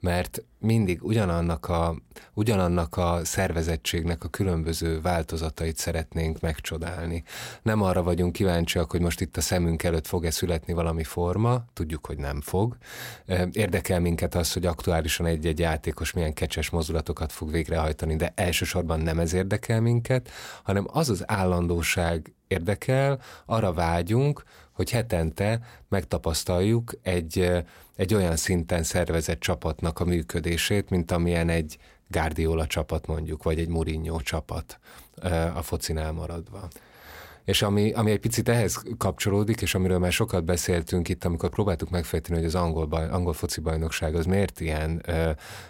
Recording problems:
none

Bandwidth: 16 kHz